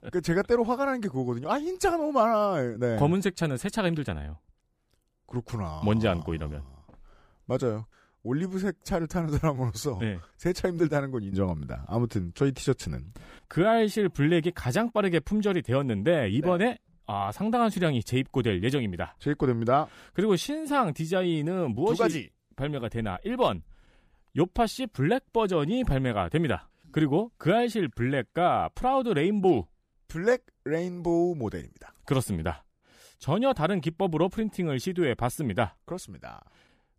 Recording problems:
none

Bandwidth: 15 kHz